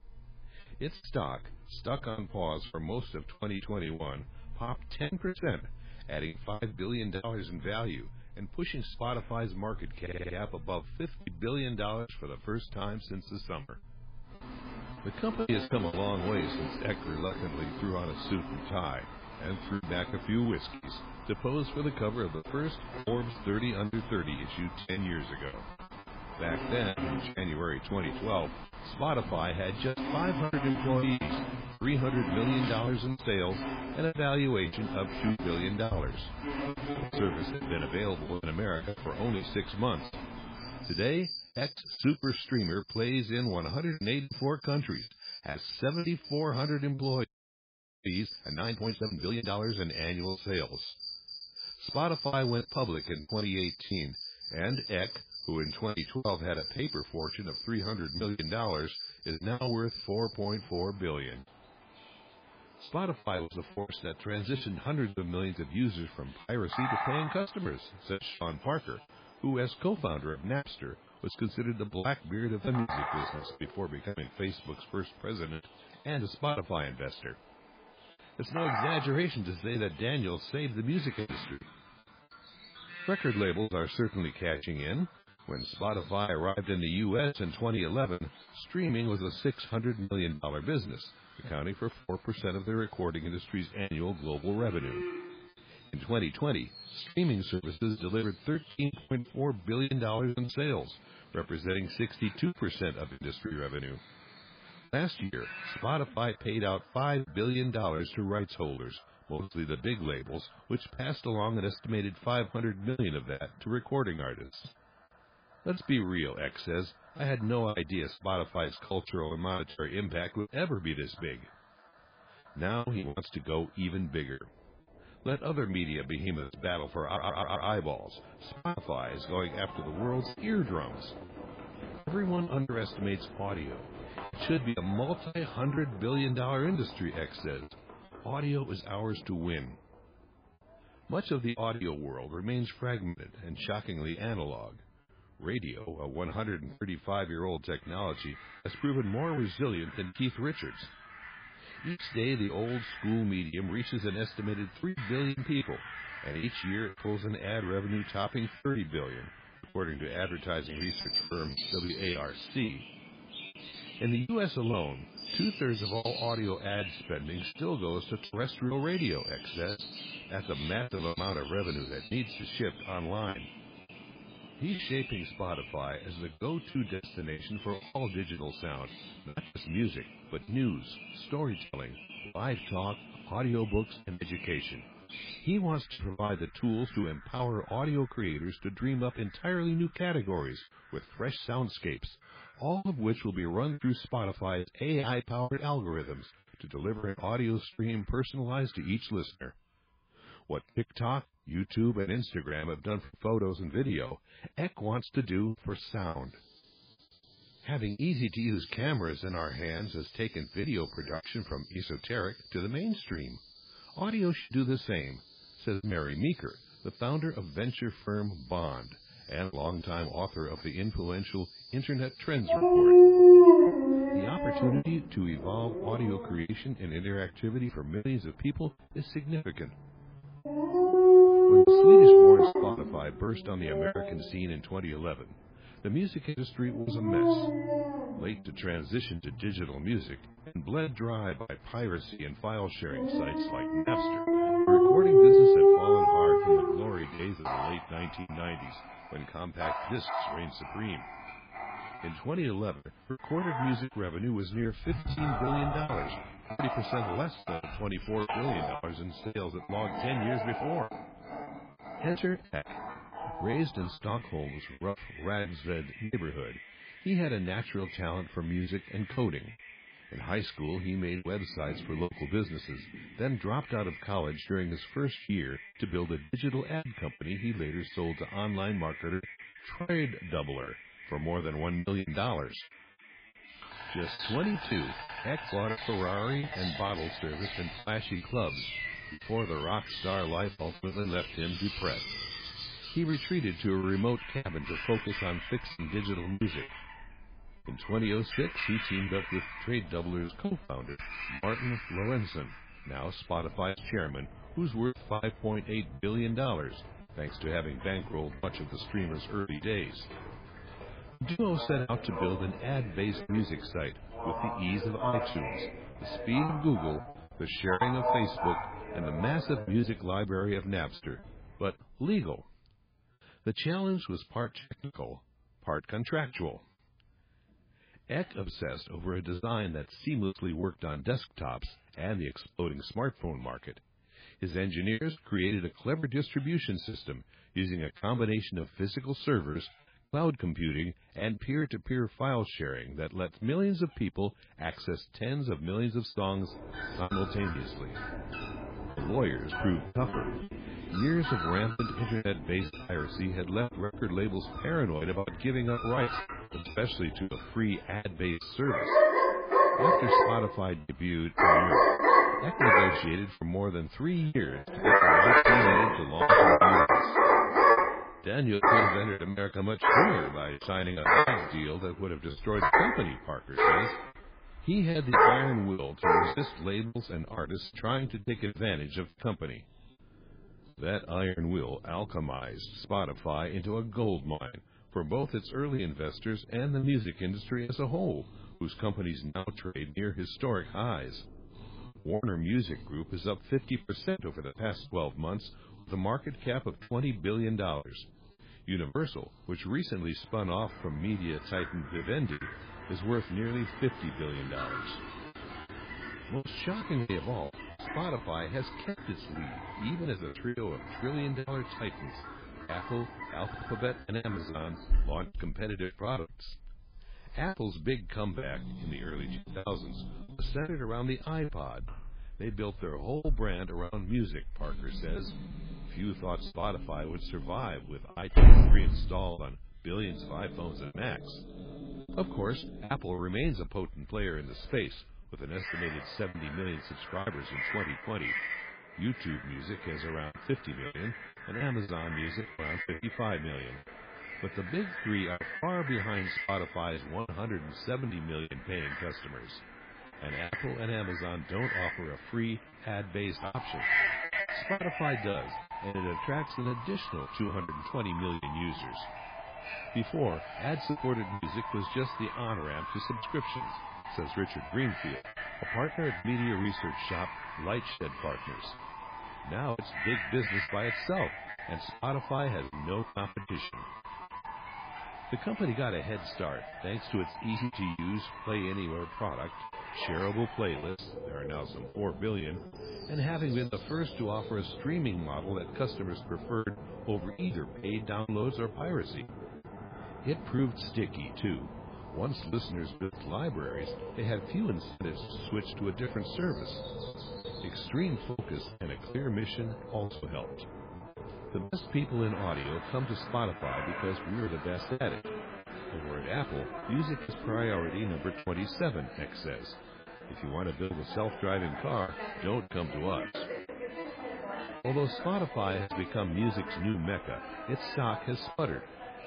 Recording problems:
garbled, watery; badly; nothing above 5 kHz
animal sounds; very loud; throughout; 5 dB above the speech
choppy; very; 9% of the speech affected
audio stuttering; at 10 s, at 2:07 and at 6:53
audio freezing; at 47 s for 1 s

